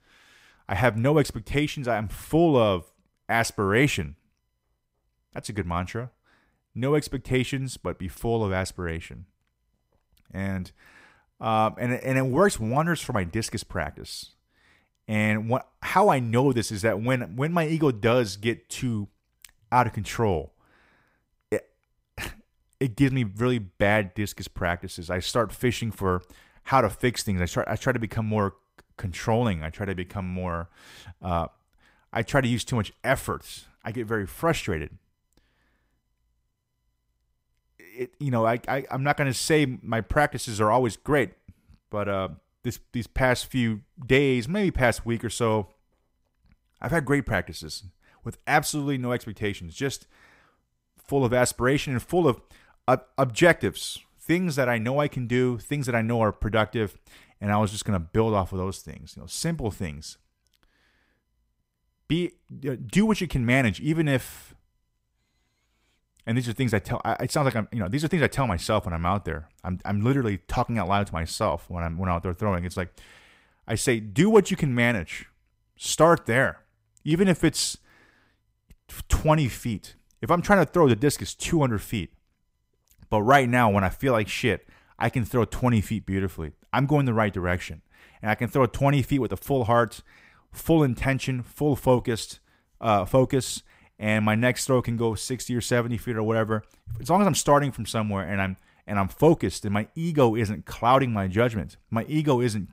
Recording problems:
none

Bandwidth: 15.5 kHz